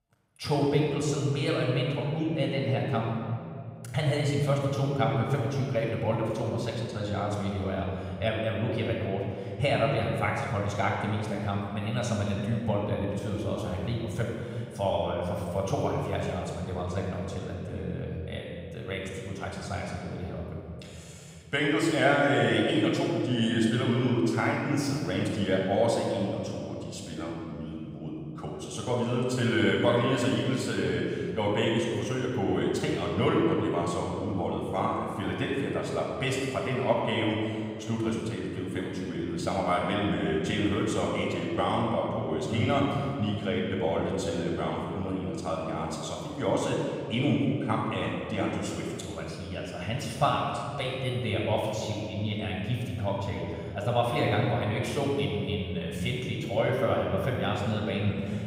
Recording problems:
off-mic speech; far
room echo; noticeable; dies away in 2.2 s

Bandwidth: 15.5 kHz